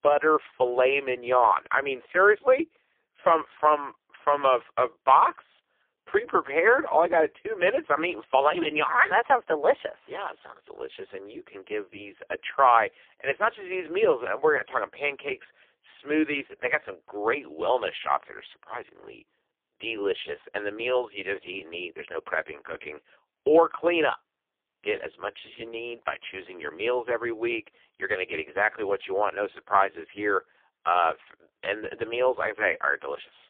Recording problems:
phone-call audio; poor line

